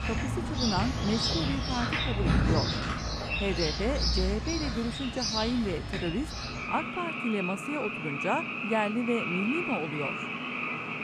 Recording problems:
animal sounds; very loud; throughout; 2 dB above the speech

